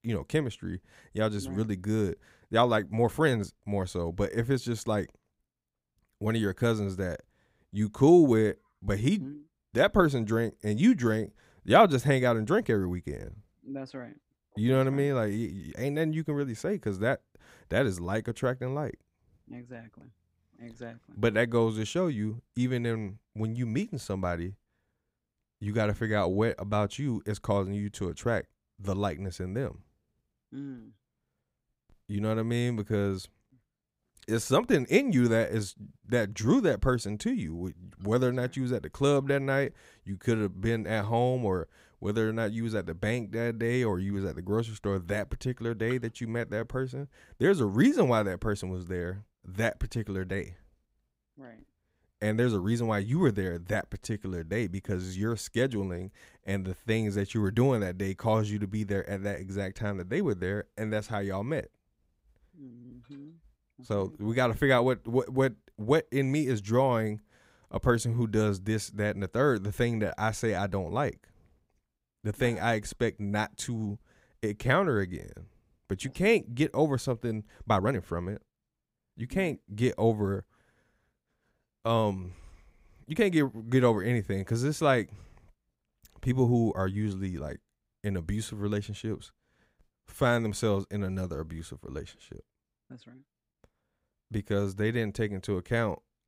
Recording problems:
uneven, jittery; strongly; from 2.5 s to 1:27

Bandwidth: 15.5 kHz